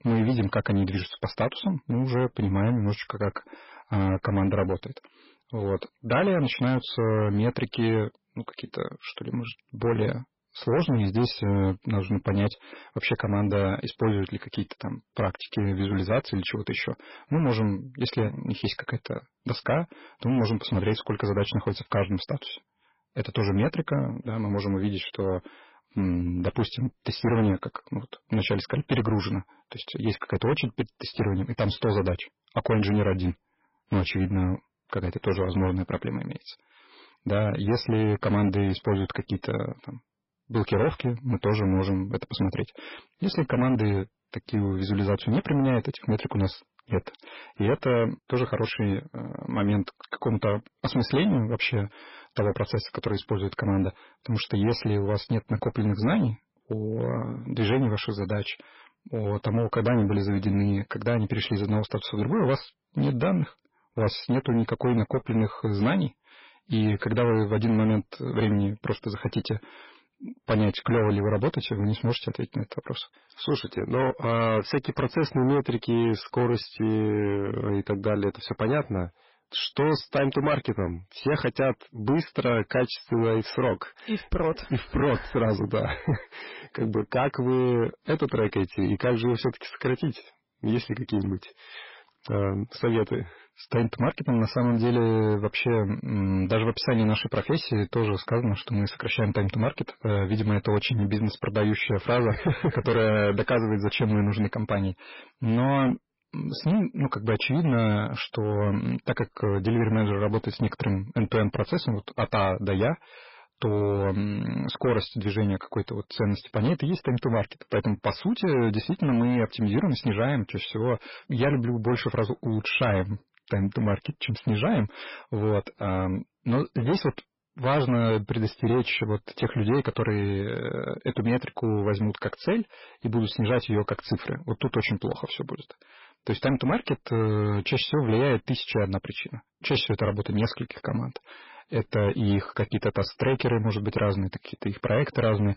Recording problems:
garbled, watery; badly; nothing above 5.5 kHz
distortion; slight; 10% of the sound clipped

